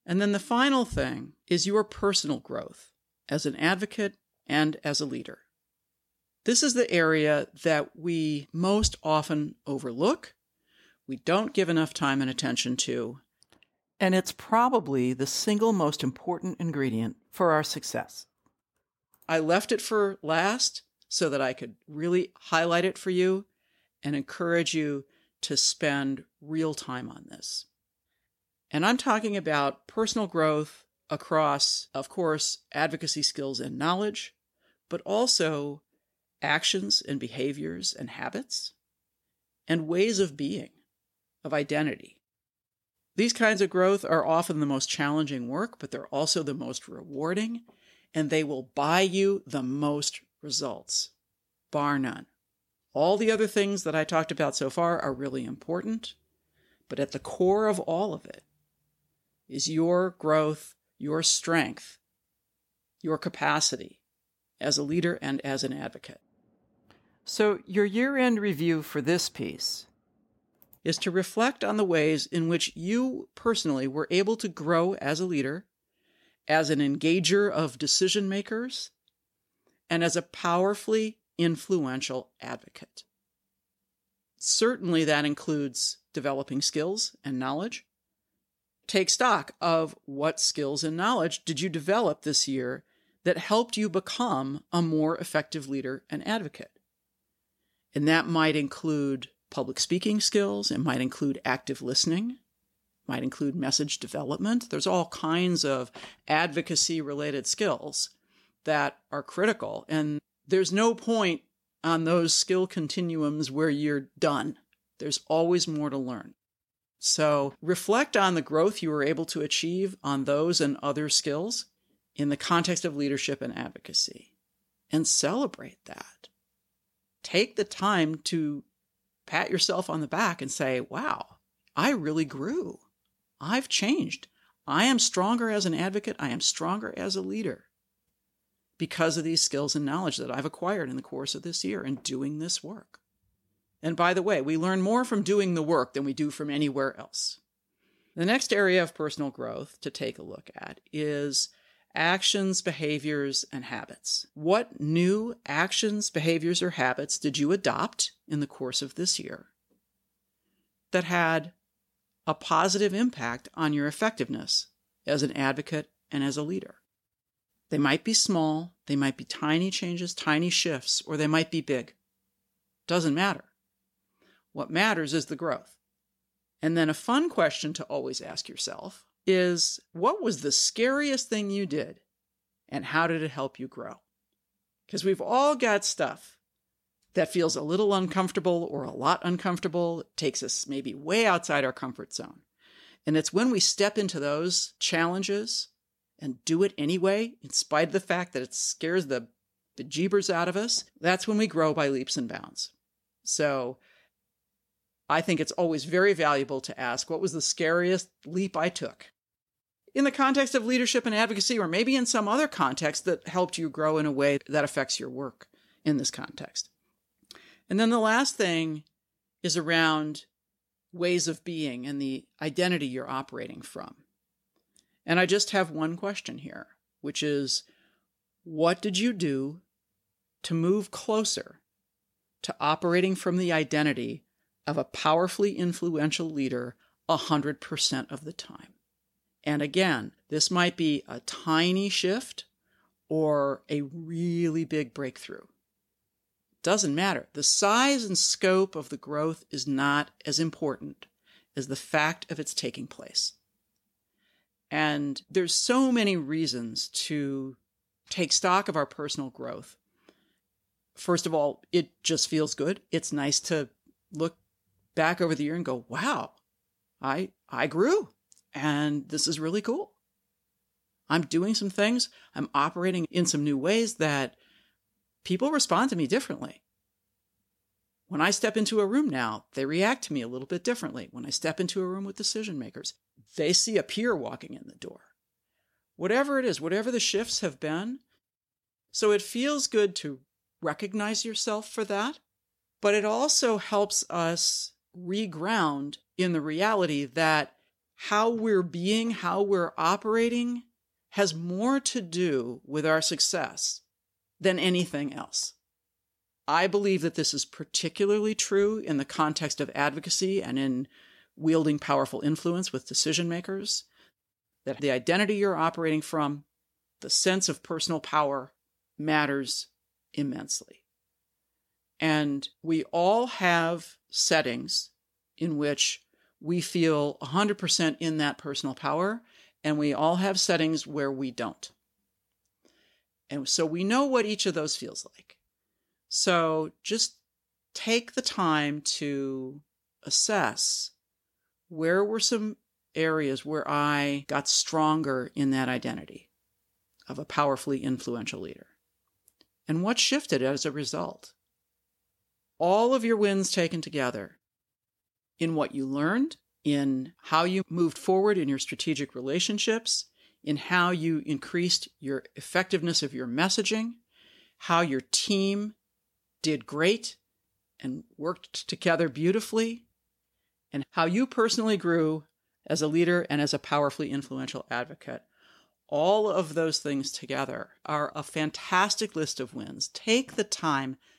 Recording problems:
none

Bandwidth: 16.5 kHz